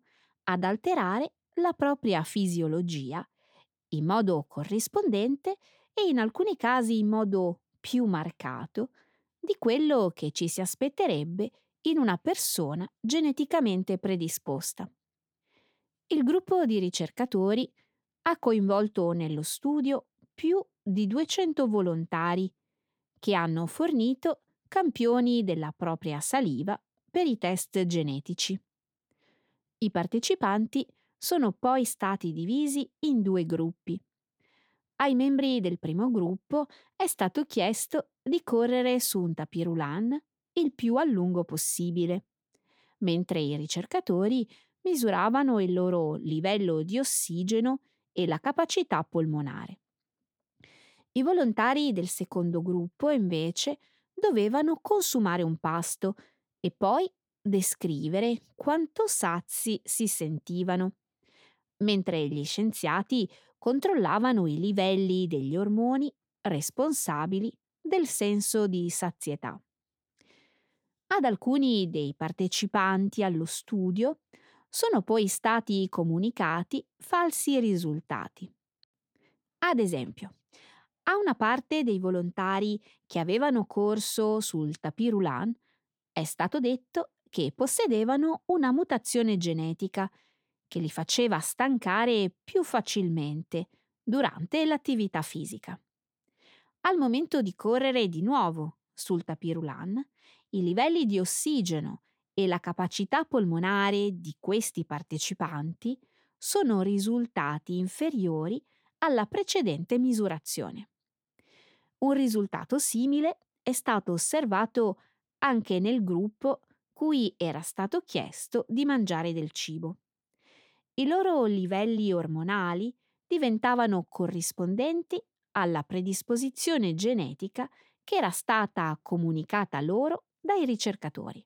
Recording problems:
none

